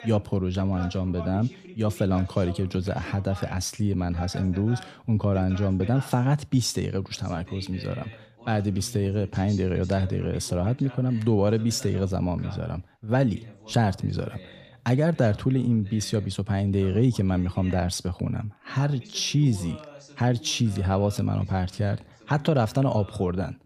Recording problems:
voice in the background; noticeable; throughout; 20 dB below the speech

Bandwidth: 15 kHz